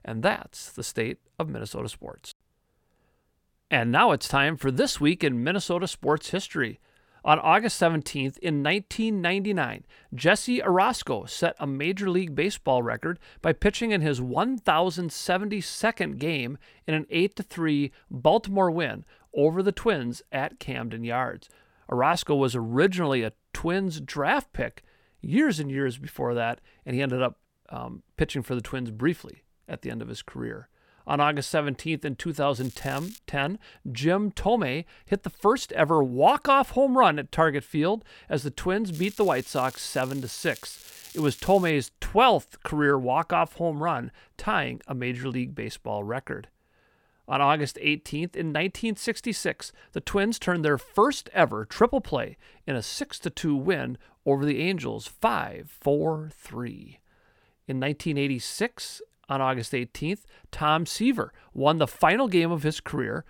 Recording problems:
crackling; noticeable; at 33 s and from 39 to 42 s; 20 dB below the speech

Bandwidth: 17 kHz